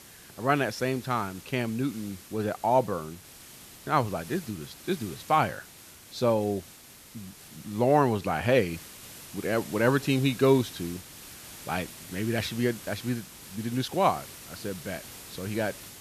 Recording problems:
hiss; noticeable; throughout; 15 dB below the speech

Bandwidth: 14 kHz